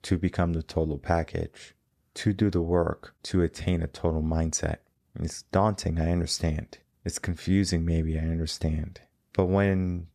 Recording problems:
none

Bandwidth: 14.5 kHz